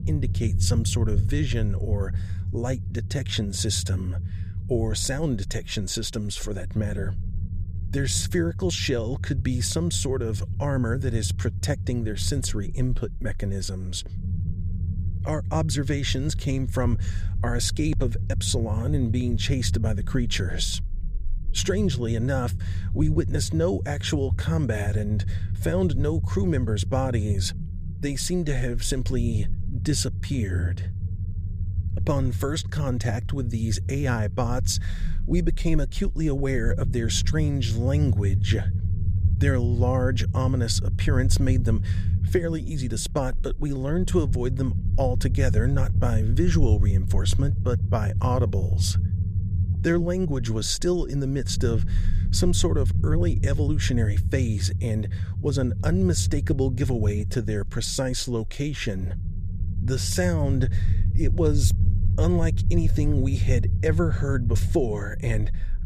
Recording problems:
low rumble; noticeable; throughout; 10 dB below the speech

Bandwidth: 15 kHz